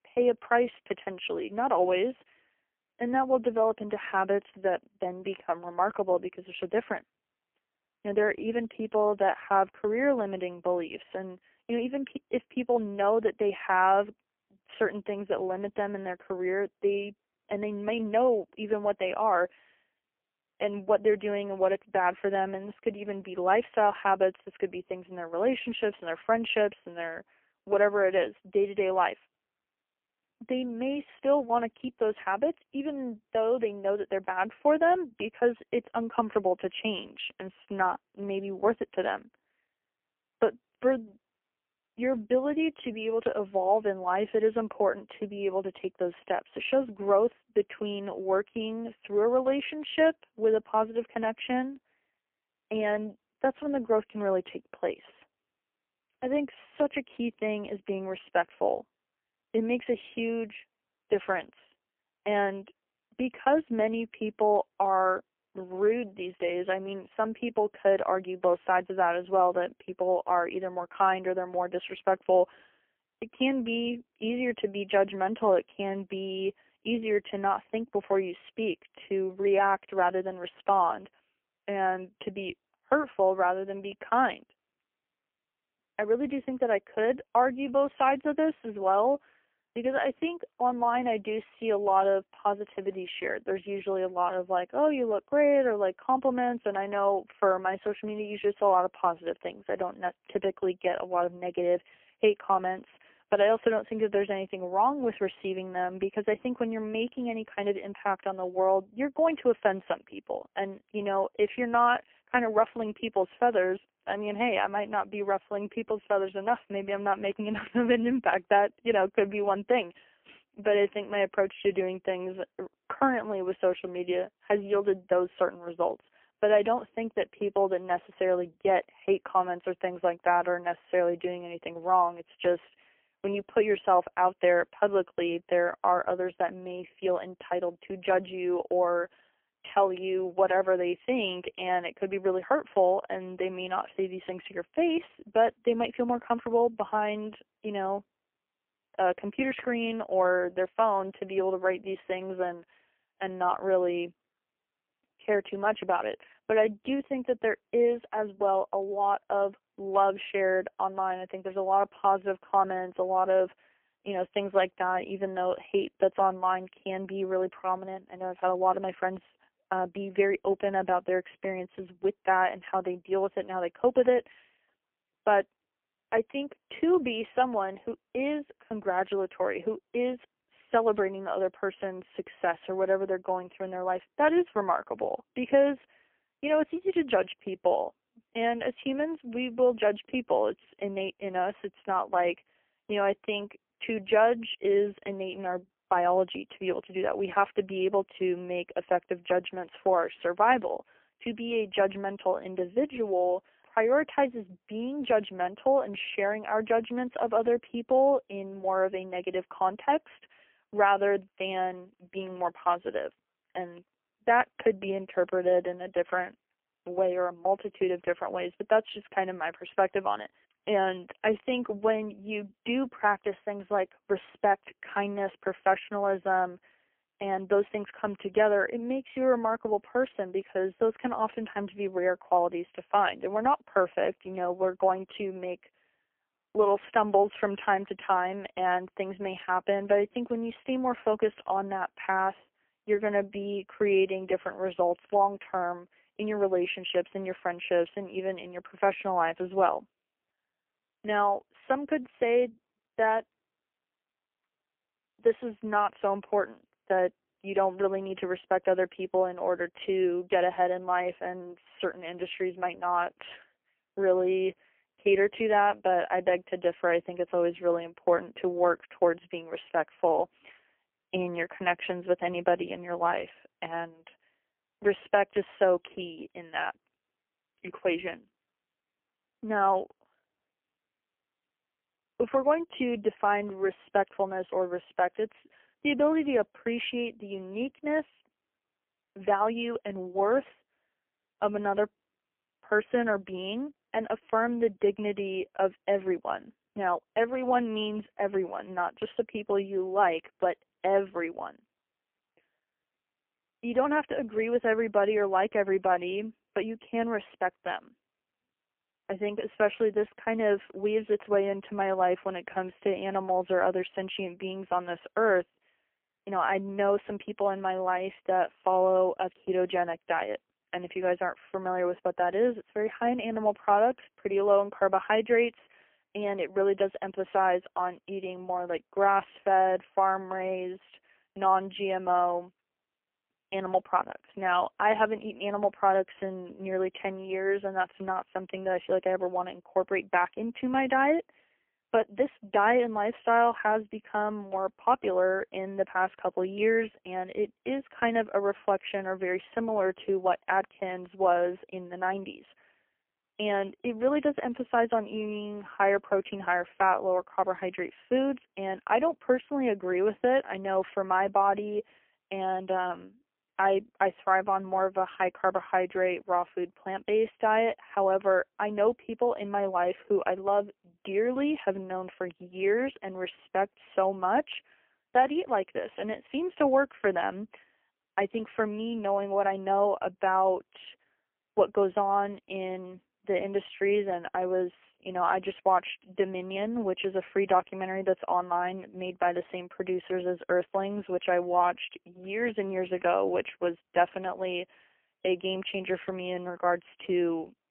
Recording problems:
phone-call audio; poor line; nothing above 3 kHz

